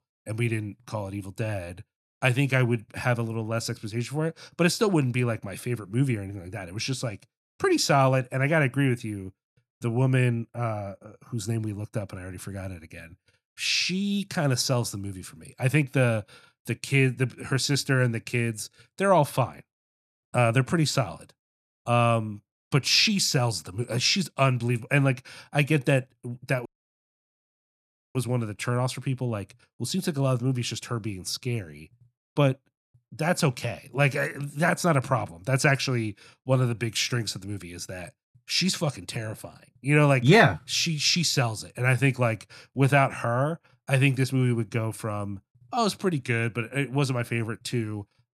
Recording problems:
audio cutting out; at 27 s for 1.5 s

